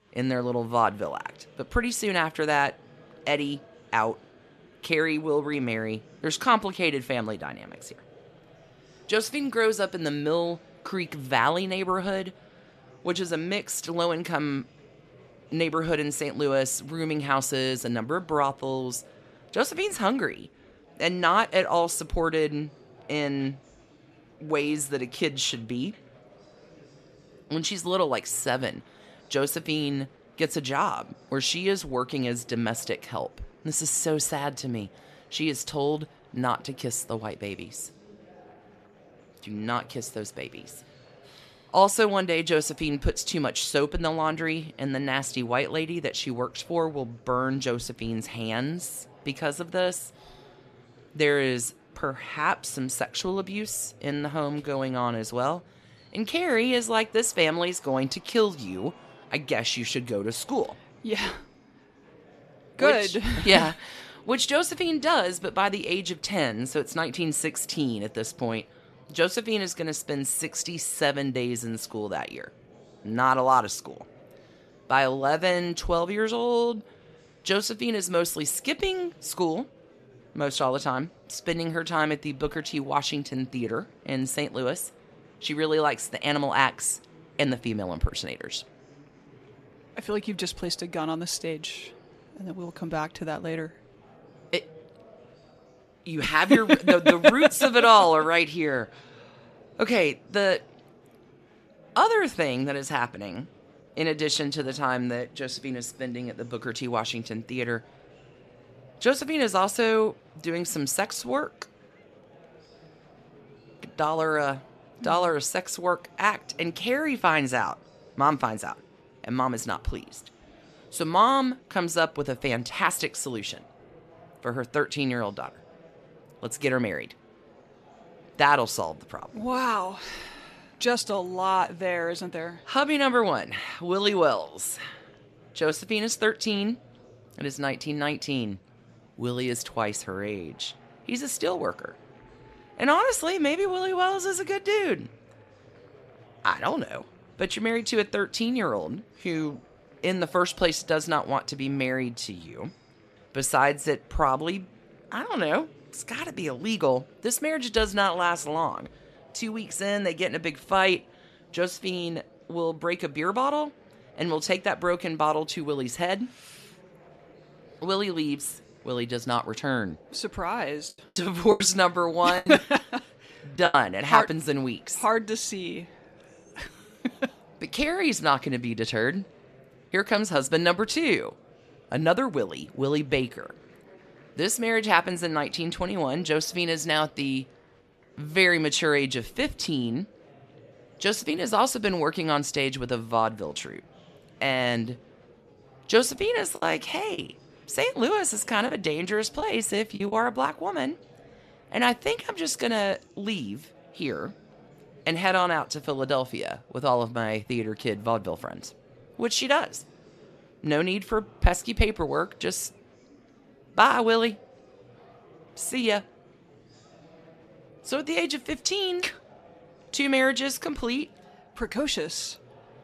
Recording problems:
murmuring crowd; faint; throughout; 25 dB below the speech
choppy; very; from 2:51 to 2:54 and from 3:17 to 3:20; 7% of the speech affected

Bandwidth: 14 kHz